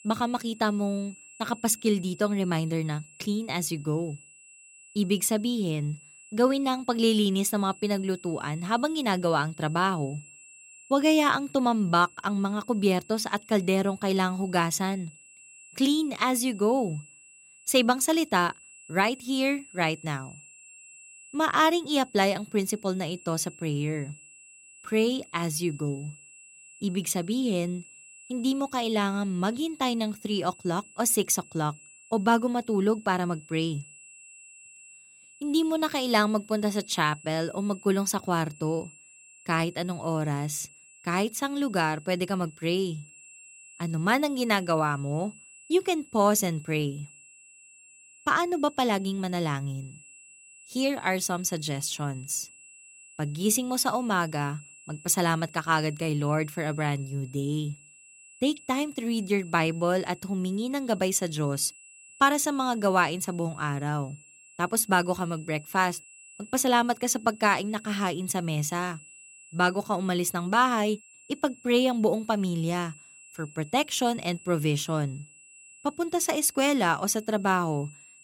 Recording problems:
high-pitched whine; faint; throughout; 2.5 kHz, 20 dB below the speech

